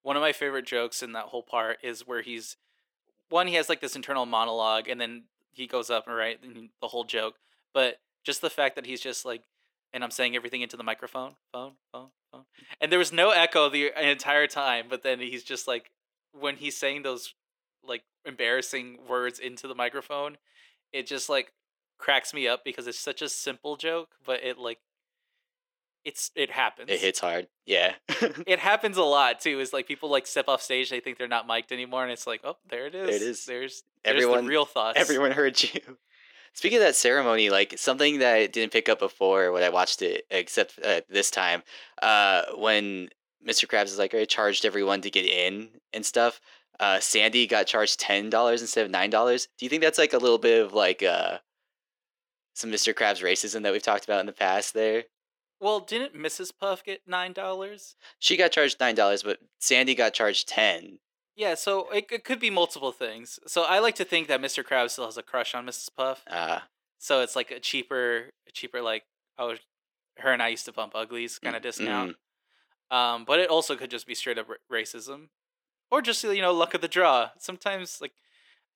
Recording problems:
thin; somewhat; fading below 350 Hz

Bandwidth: 18 kHz